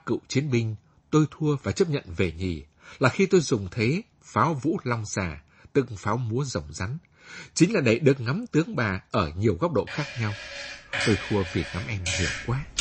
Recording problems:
garbled, watery; slightly; nothing above 8 kHz
household noises; loud; from 10 s on; 6 dB below the speech

